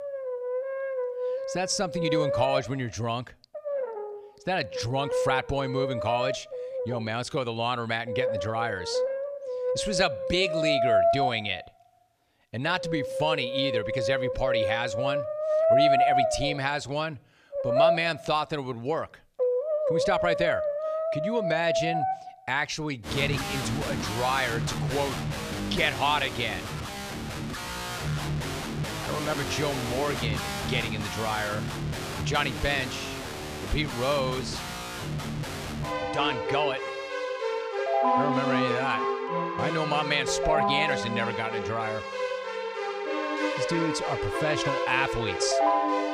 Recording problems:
background music; very loud; throughout; as loud as the speech

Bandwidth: 14.5 kHz